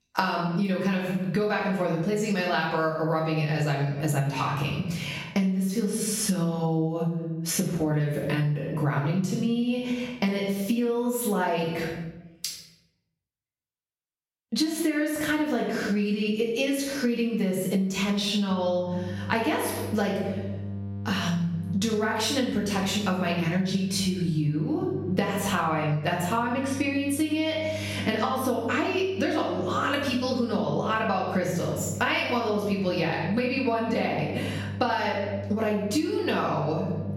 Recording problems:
off-mic speech; far
room echo; noticeable; dies away in 0.8 s
squashed, flat; somewhat
electrical hum; faint; from 19 s on; 50 Hz, 20 dB below the speech

